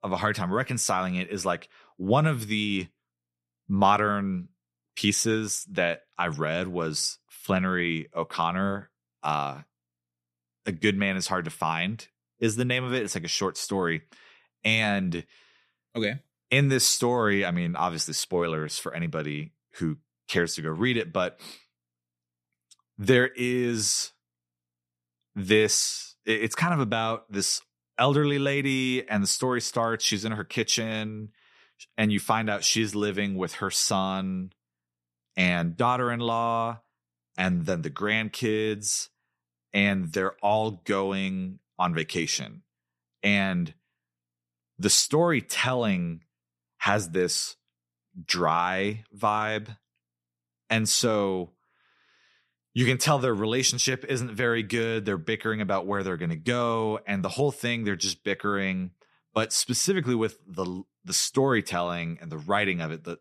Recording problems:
none

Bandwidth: 13.5 kHz